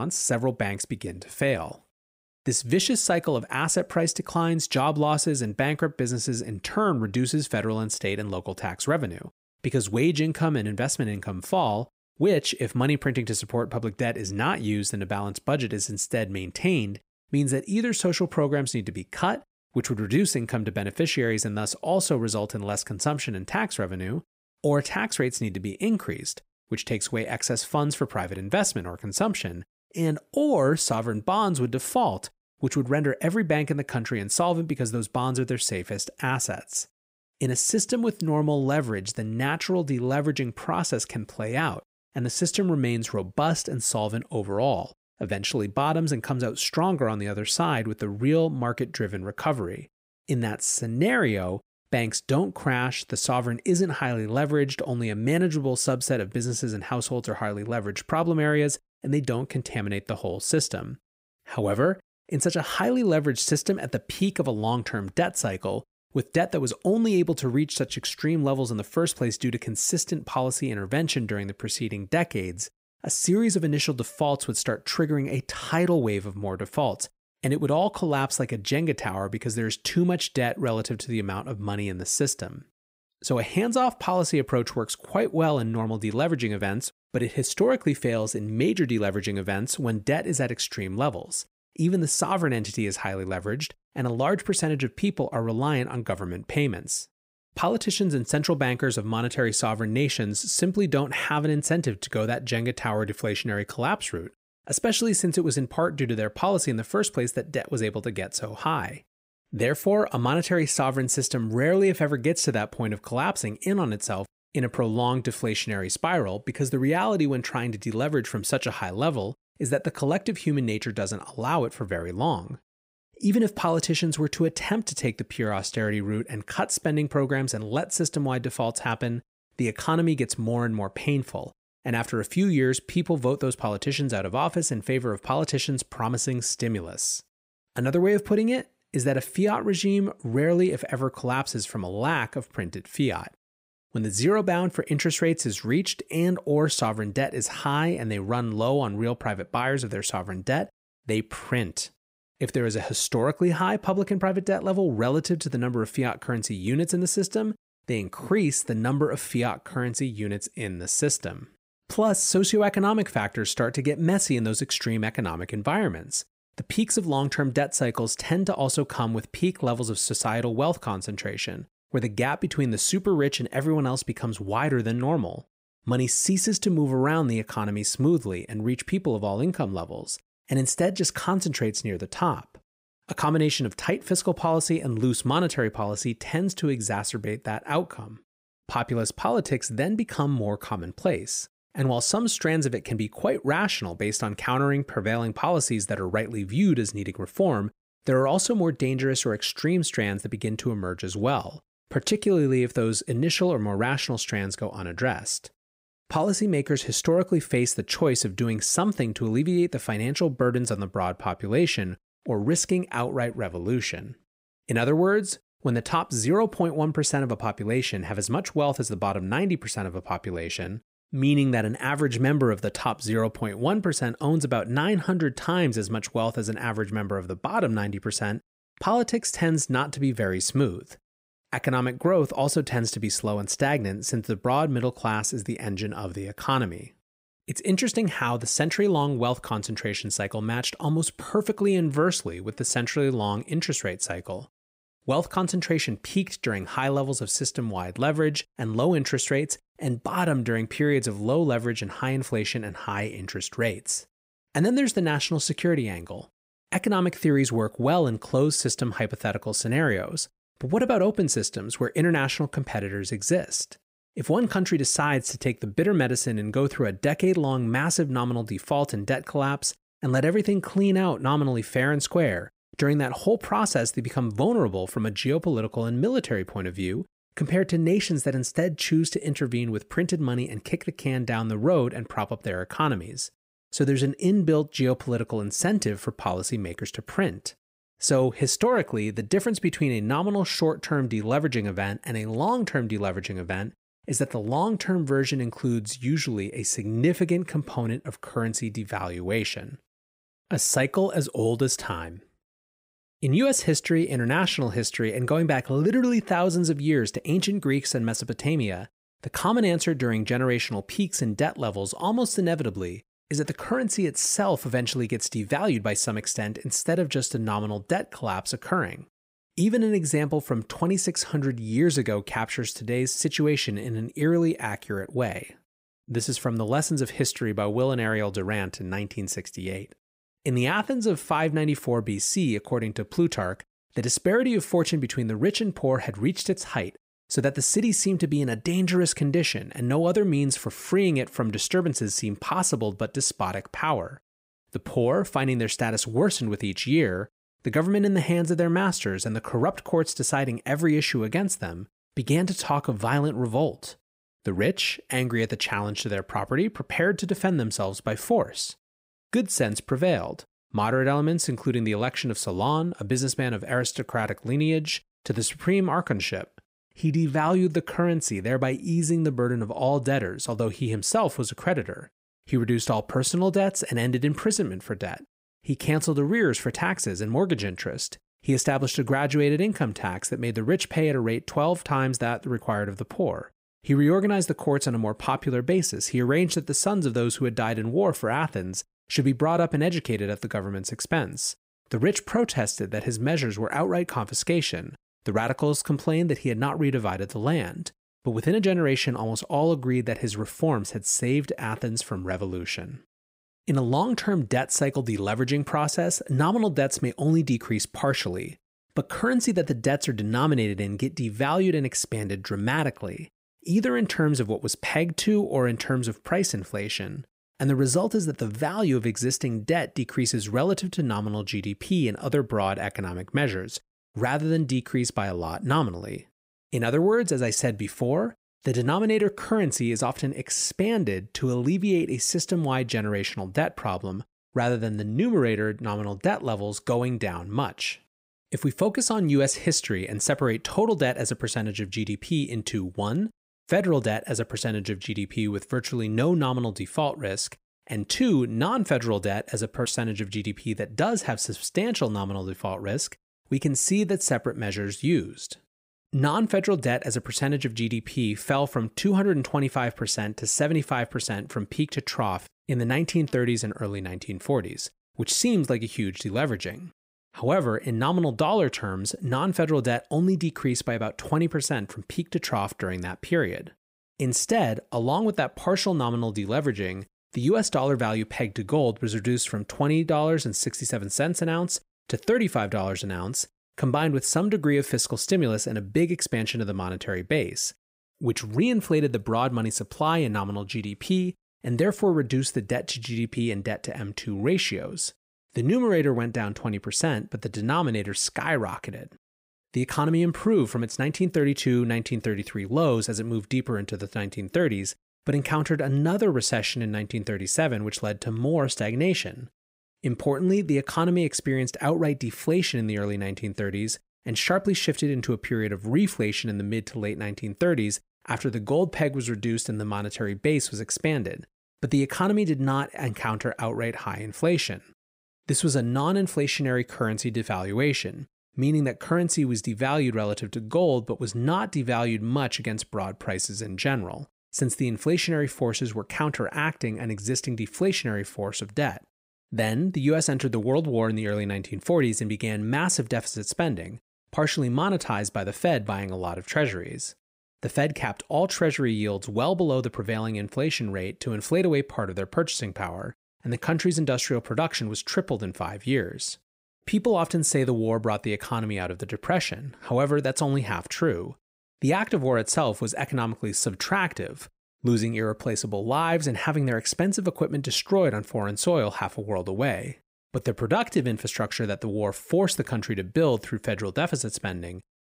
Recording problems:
abrupt cut into speech; at the start

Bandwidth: 15.5 kHz